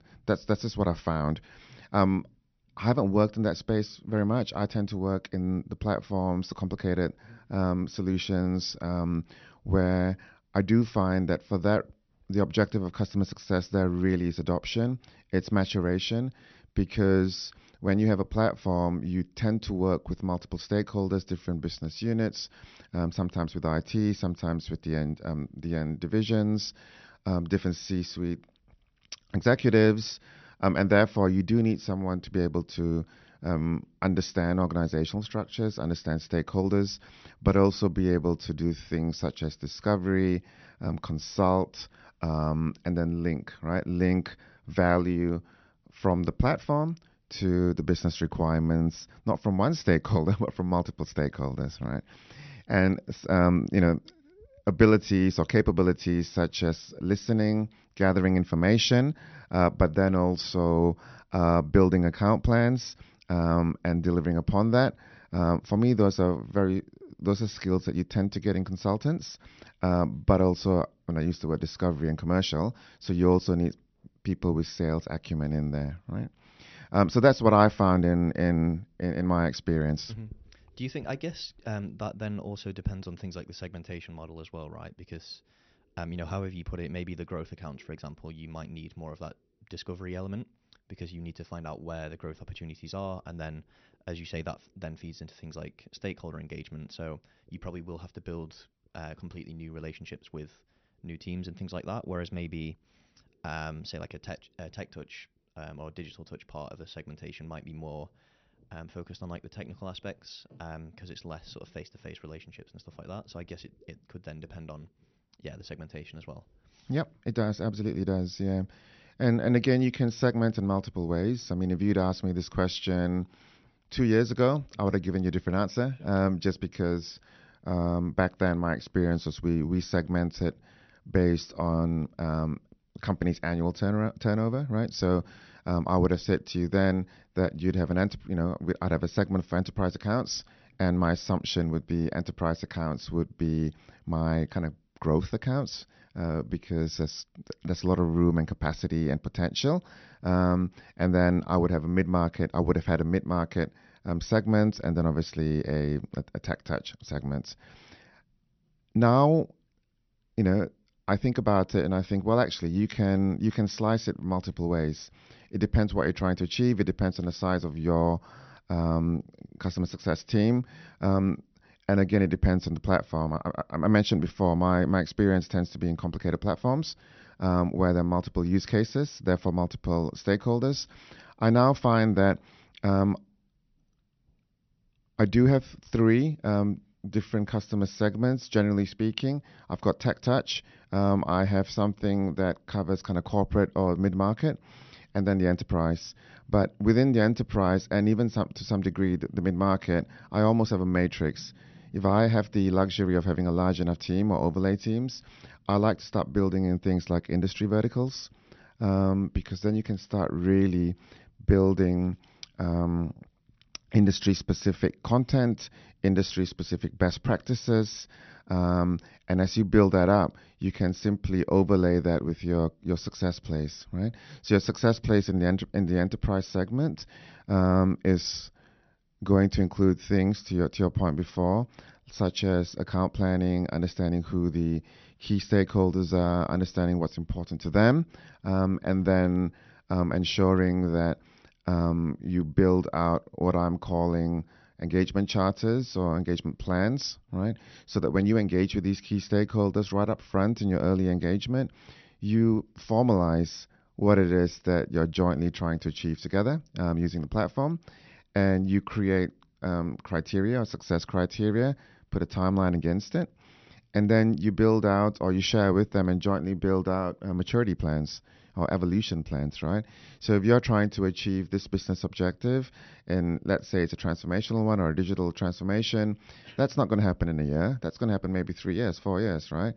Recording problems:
high frequencies cut off; noticeable; nothing above 6 kHz

